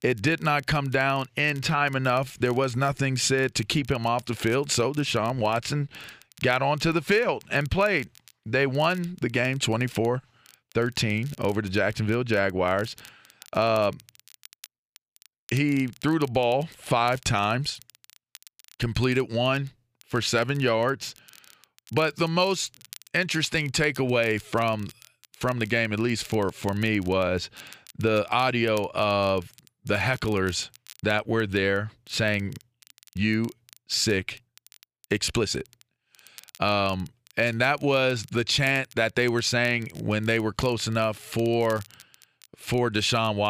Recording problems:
crackle, like an old record; faint; 25 dB below the speech
abrupt cut into speech; at the end

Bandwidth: 15 kHz